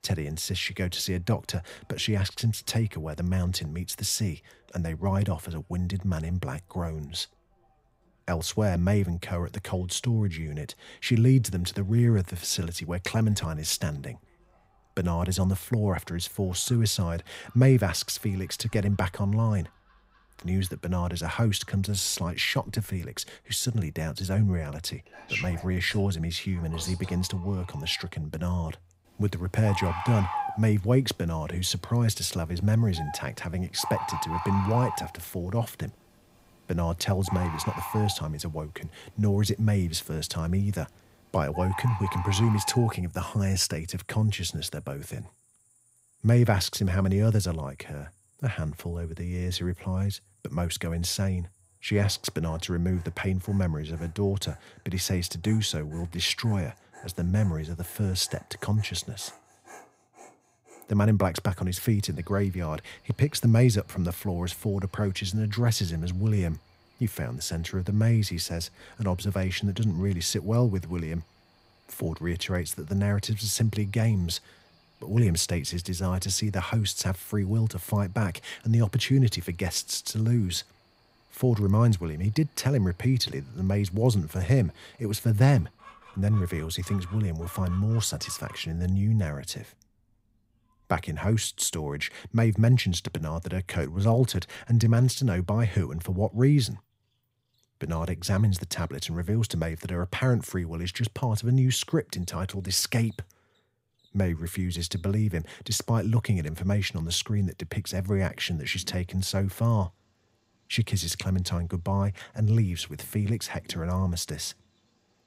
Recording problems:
animal sounds; noticeable; throughout; 10 dB below the speech

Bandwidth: 15.5 kHz